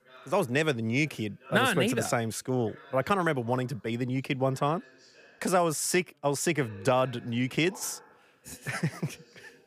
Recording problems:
background chatter; faint; throughout; 3 voices, 25 dB below the speech

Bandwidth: 15 kHz